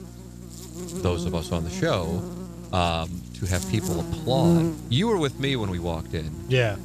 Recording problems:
electrical hum; loud; throughout; 60 Hz, 7 dB below the speech

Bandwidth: 14 kHz